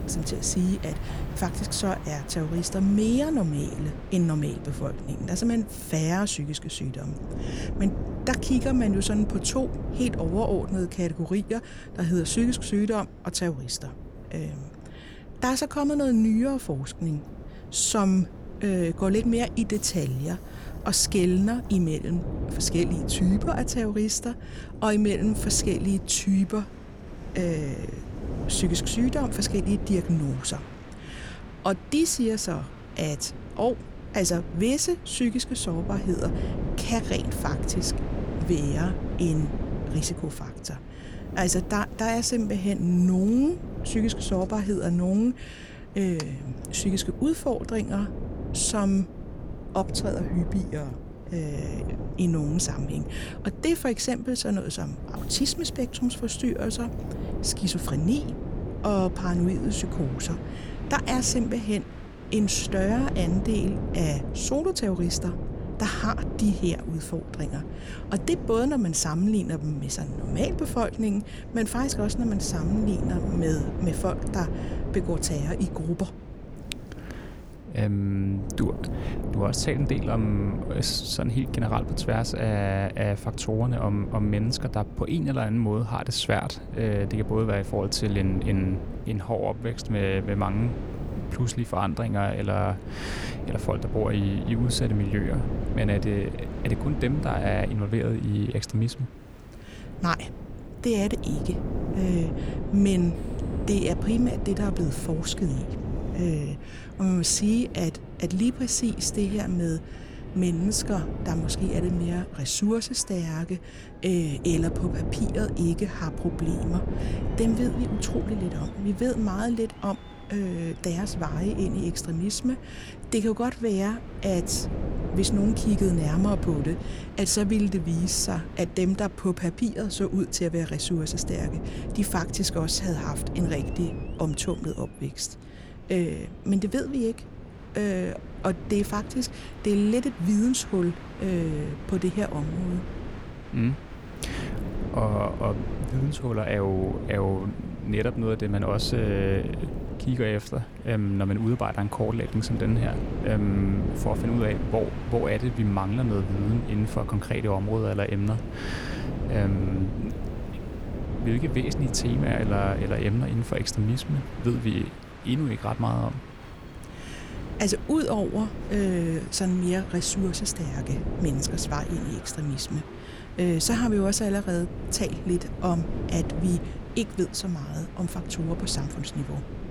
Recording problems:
wind noise on the microphone; occasional gusts; 10 dB below the speech
train or aircraft noise; faint; throughout; 20 dB below the speech

